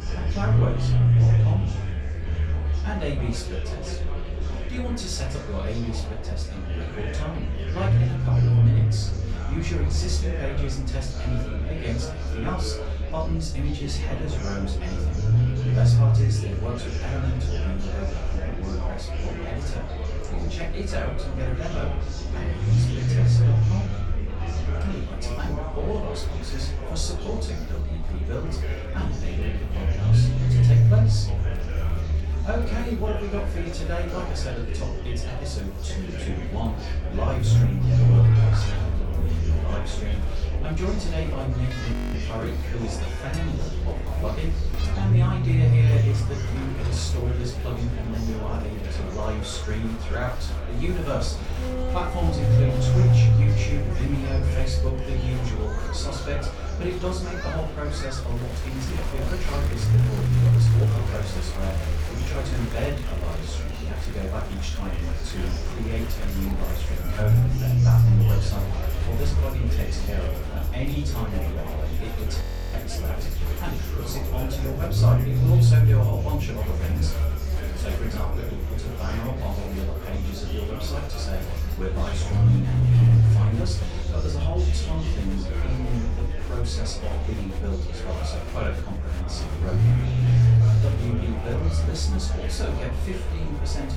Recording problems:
off-mic speech; far
room echo; slight; dies away in 0.3 s
murmuring crowd; loud; throughout; 5 dB below the speech
low rumble; loud; throughout; 1 dB below the speech
background music; noticeable; throughout; 10 dB below the speech
audio freezing; at 42 s and at 1:12

